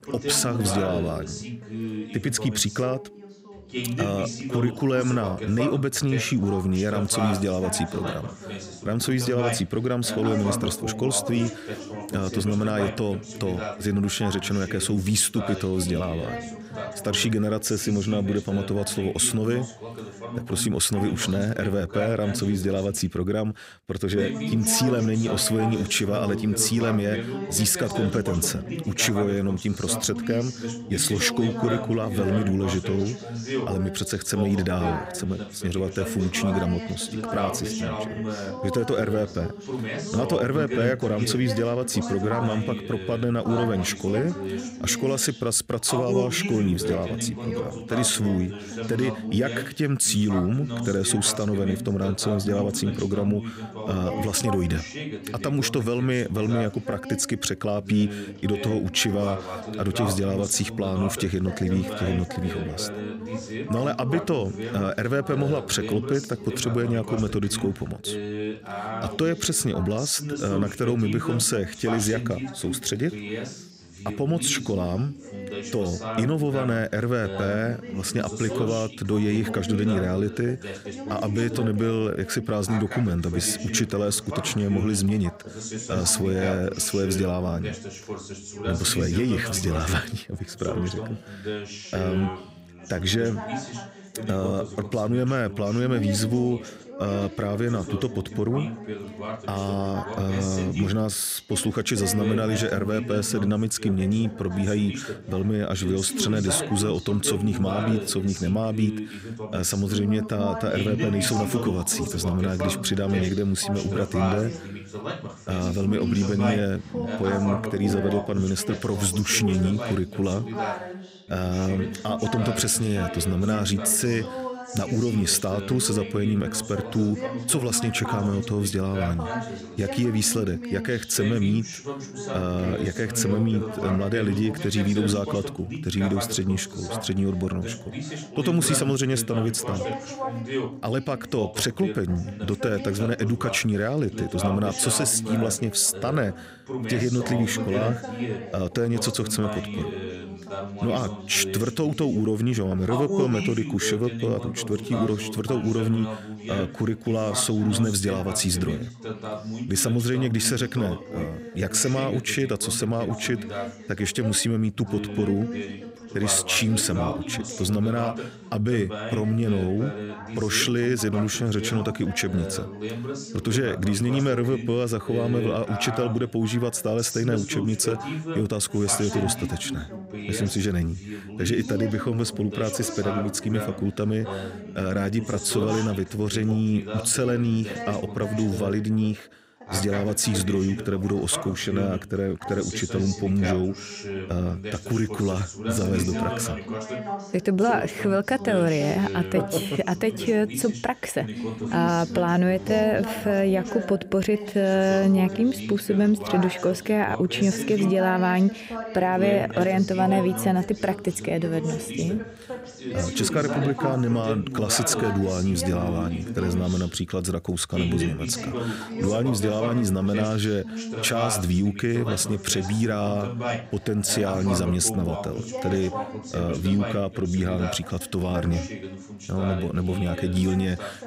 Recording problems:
background chatter; loud; throughout; 2 voices, 8 dB below the speech

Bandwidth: 15.5 kHz